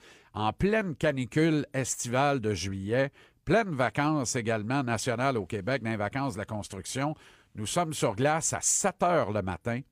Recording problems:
none

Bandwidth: 15 kHz